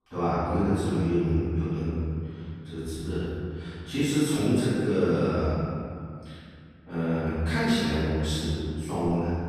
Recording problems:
room echo; strong; dies away in 2.3 s
off-mic speech; far

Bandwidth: 14.5 kHz